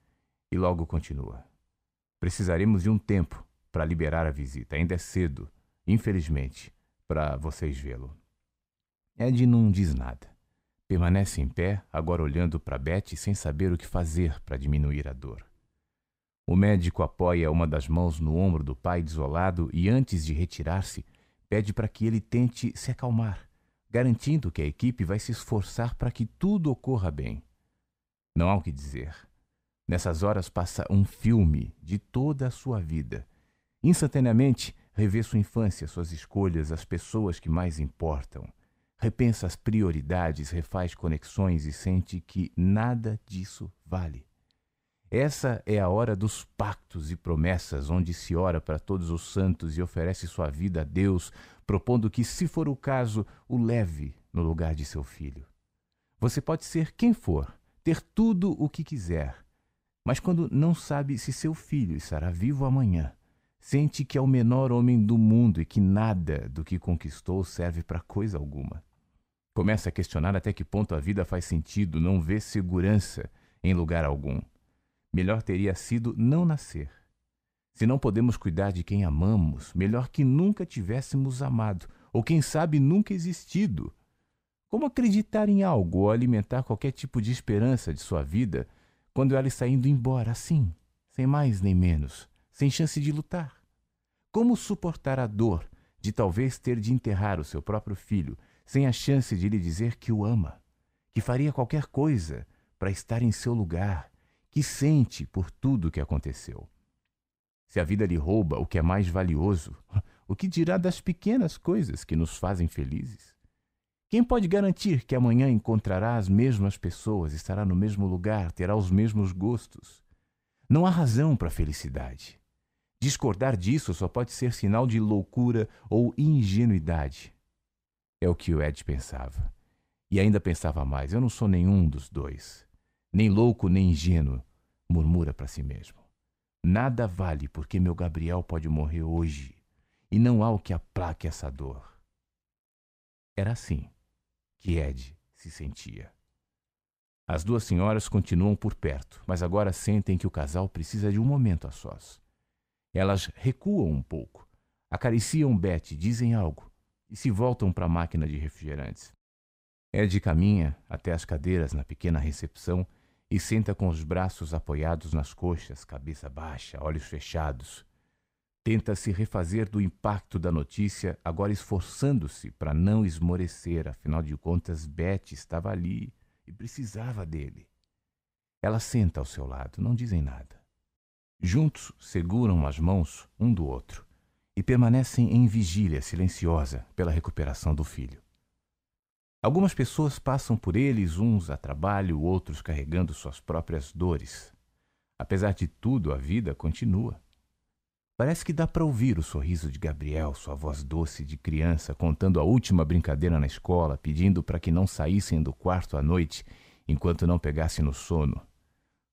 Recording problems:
none

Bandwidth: 15.5 kHz